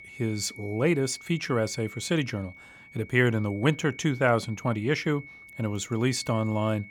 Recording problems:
high-pitched whine; noticeable; throughout; 2 kHz, 15 dB below the speech

